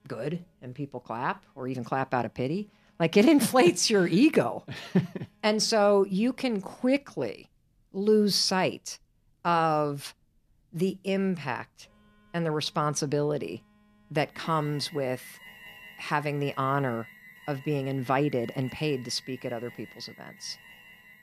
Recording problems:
alarms or sirens; faint; throughout; 20 dB below the speech

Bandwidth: 14.5 kHz